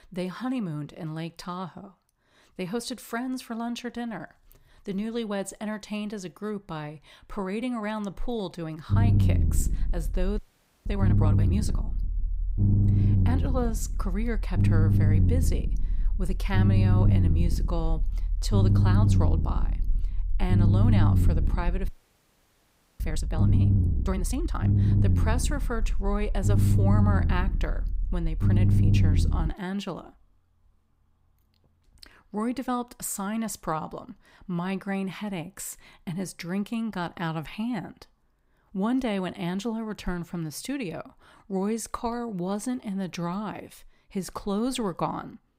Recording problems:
low rumble; loud; from 9 to 30 s; 2 dB below the speech
audio freezing; at 10 s and at 22 s for 1 s

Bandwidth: 15.5 kHz